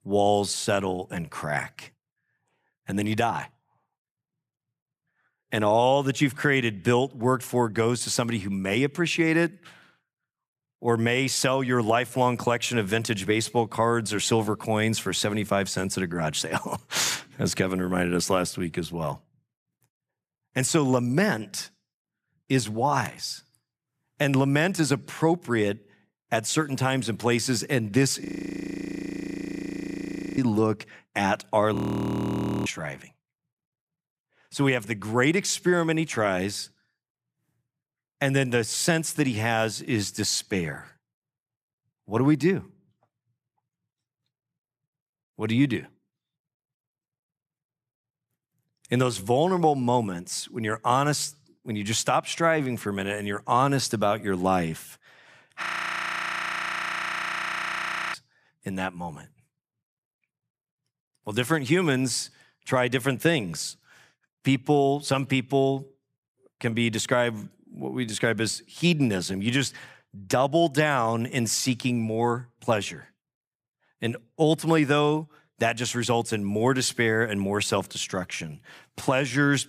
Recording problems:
audio freezing; at 28 s for 2 s, at 32 s for 1 s and at 56 s for 2.5 s

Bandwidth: 15 kHz